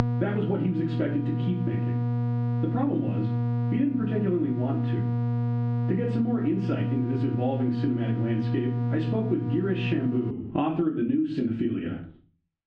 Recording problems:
off-mic speech; far
muffled; very; fading above 2.5 kHz
room echo; slight; dies away in 0.3 s
squashed, flat; somewhat
electrical hum; loud; until 10 s; 60 Hz, 6 dB below the speech

